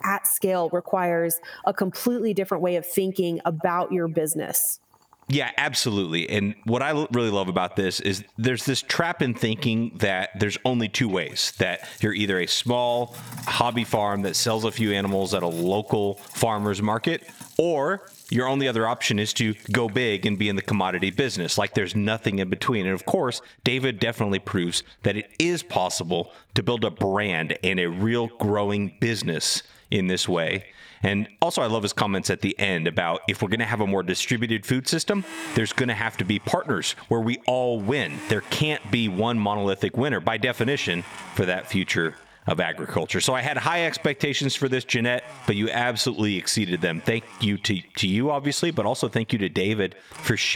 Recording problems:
echo of what is said; faint; throughout; 140 ms later, 25 dB below the speech
squashed, flat; somewhat, background pumping
household noises; faint; throughout; 20 dB below the speech
abrupt cut into speech; at the end

